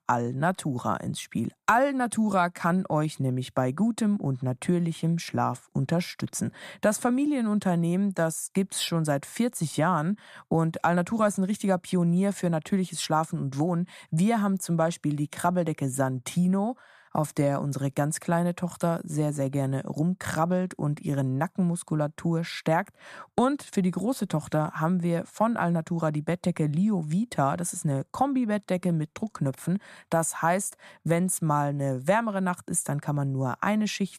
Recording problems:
none

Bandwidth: 14.5 kHz